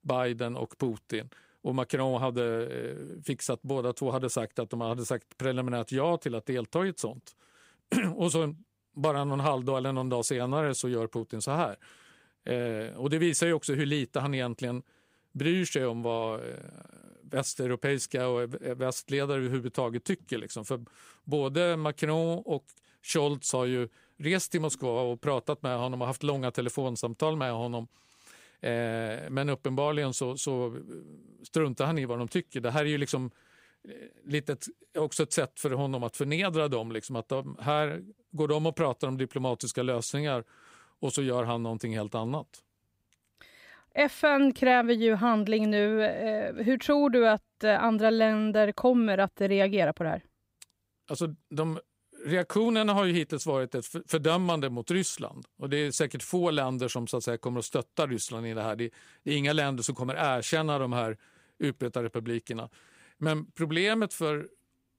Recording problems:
none

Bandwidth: 15.5 kHz